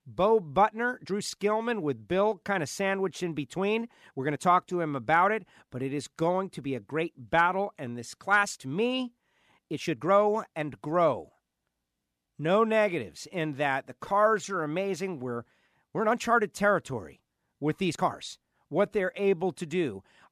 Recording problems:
uneven, jittery; strongly; from 1 to 19 s

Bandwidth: 14 kHz